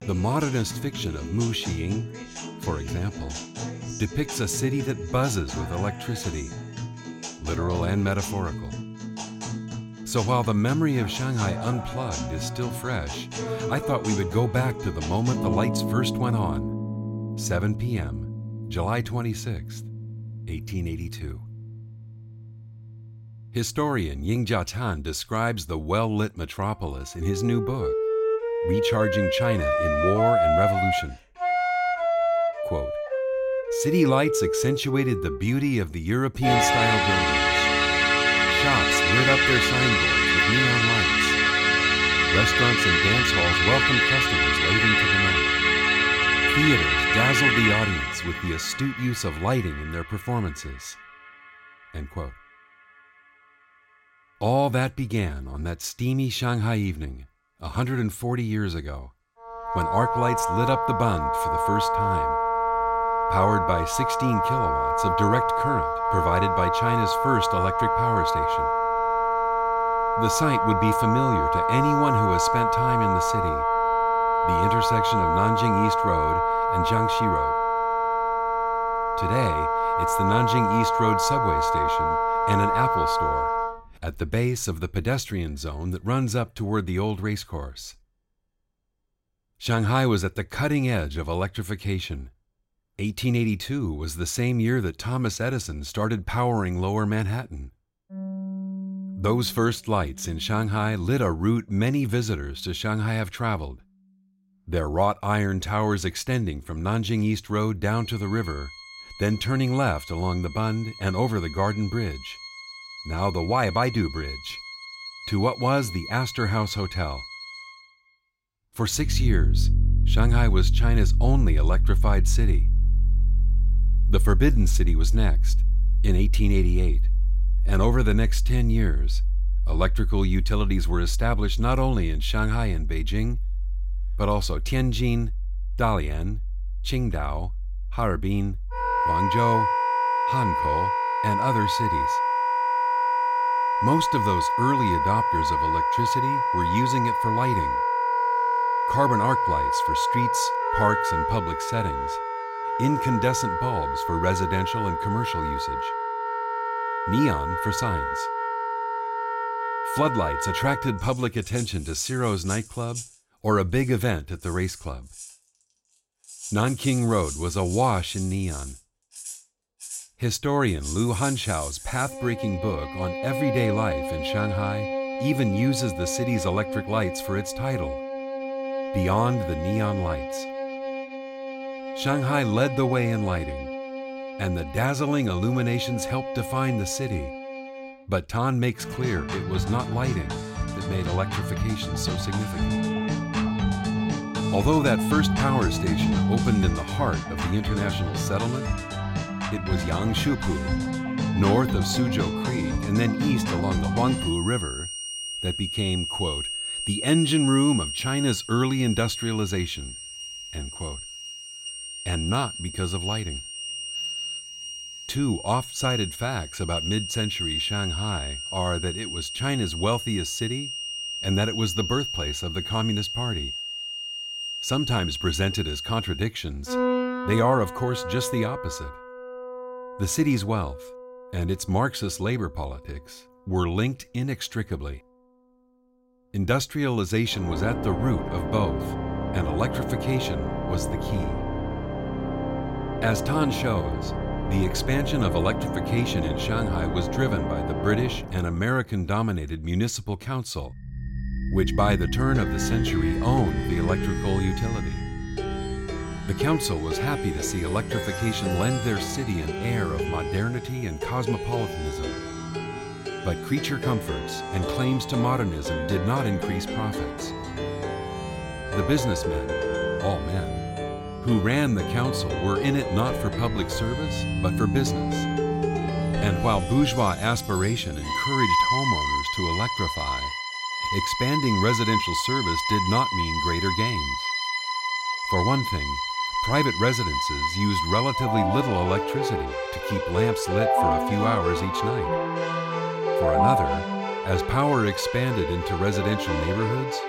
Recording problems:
background music; very loud; throughout; 1 dB above the speech

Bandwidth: 16 kHz